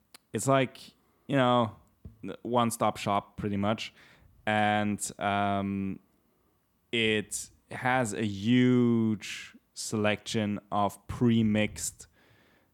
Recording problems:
none

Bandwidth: 18.5 kHz